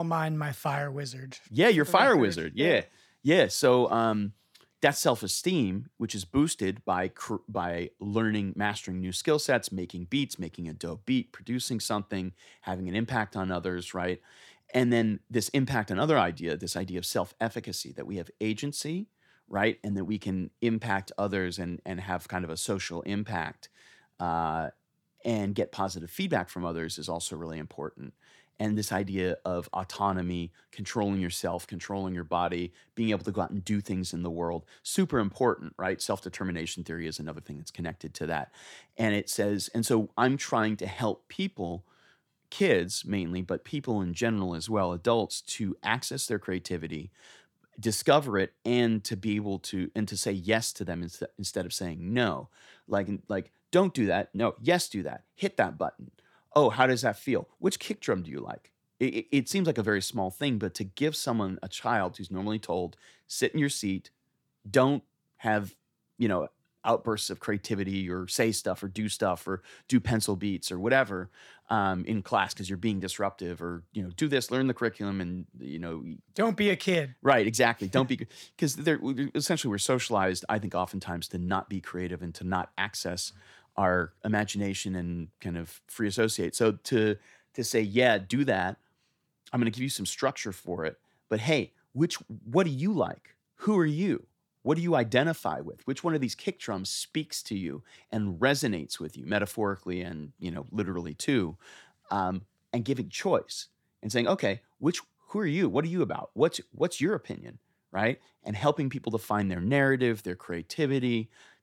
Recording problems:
abrupt cut into speech; at the start

